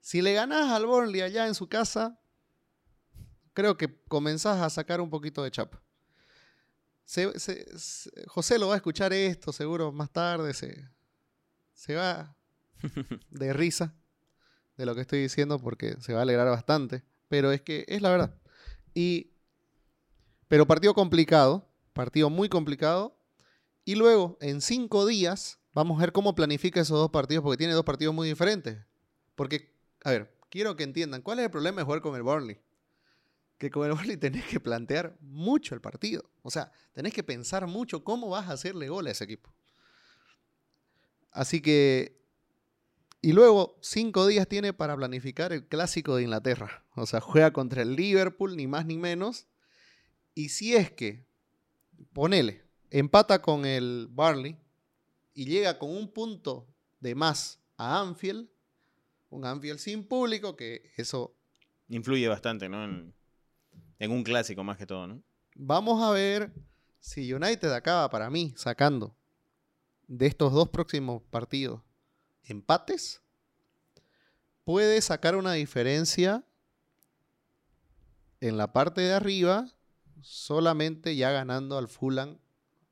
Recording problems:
none

